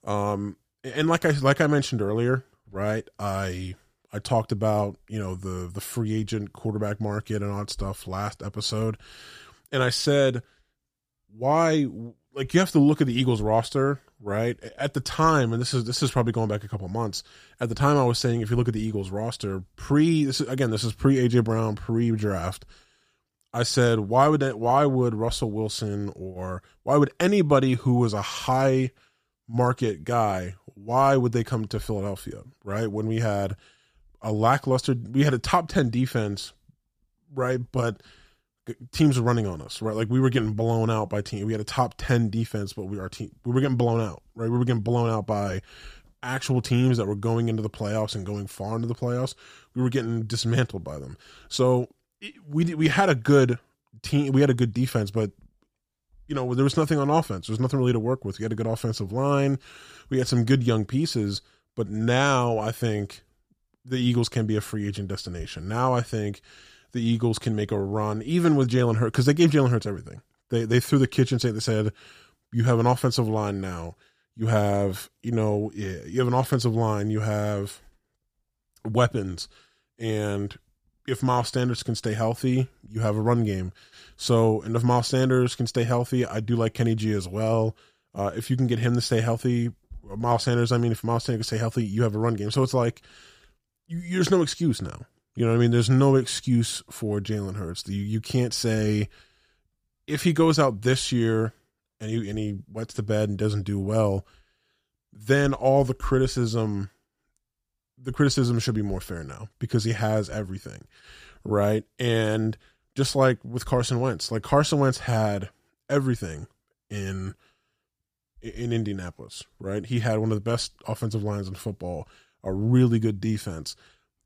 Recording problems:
none

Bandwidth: 15 kHz